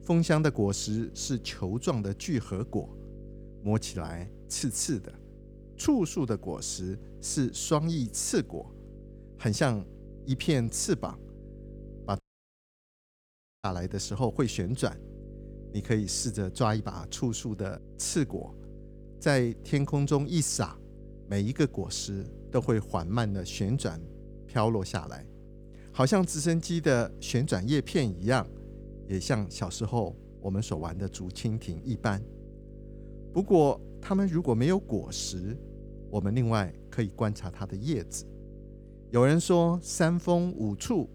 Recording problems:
electrical hum; faint; throughout; 50 Hz, 20 dB below the speech
audio cutting out; at 12 s for 1.5 s

